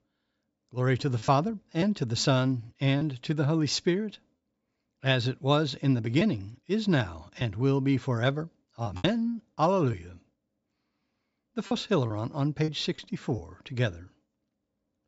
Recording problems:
high frequencies cut off; noticeable; nothing above 7.5 kHz
choppy; occasionally; 4% of the speech affected

